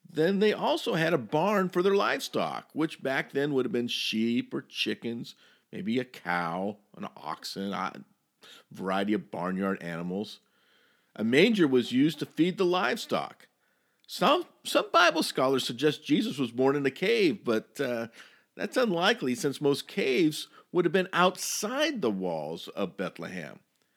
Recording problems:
none

